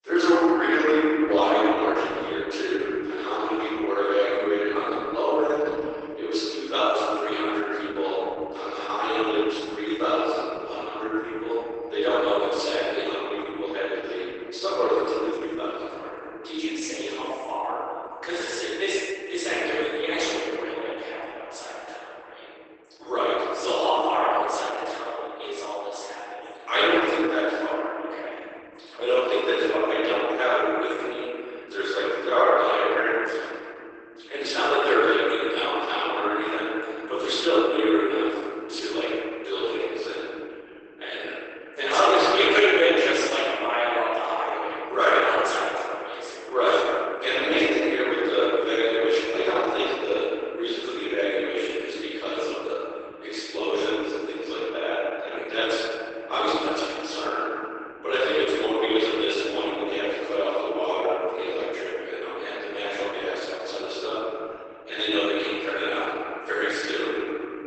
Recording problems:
room echo; strong; dies away in 2.8 s
off-mic speech; far
garbled, watery; badly; nothing above 8 kHz
thin; very; fading below 300 Hz

